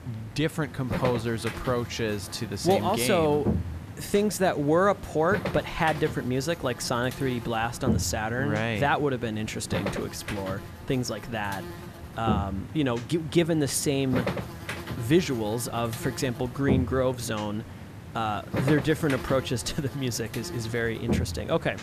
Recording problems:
electrical hum; noticeable; throughout; 50 Hz, 10 dB below the speech

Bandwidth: 14.5 kHz